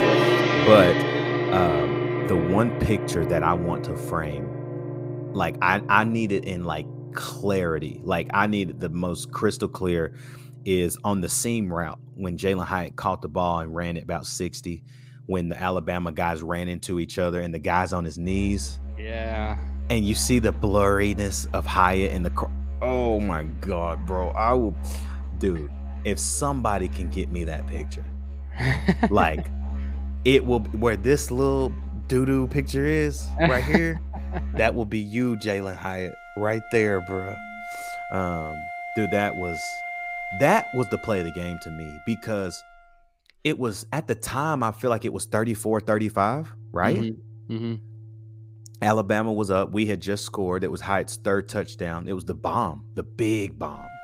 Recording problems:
background music; loud; throughout; 5 dB below the speech

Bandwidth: 15.5 kHz